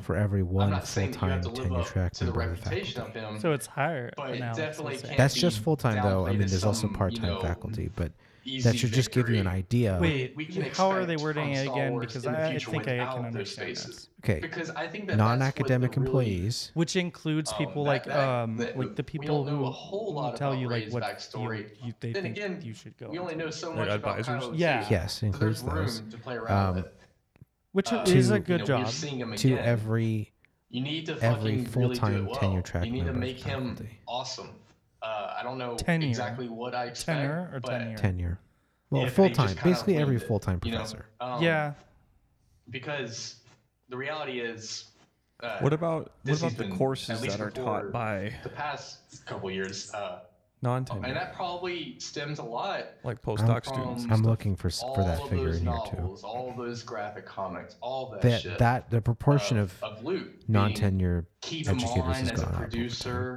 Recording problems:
voice in the background; loud; throughout; 6 dB below the speech

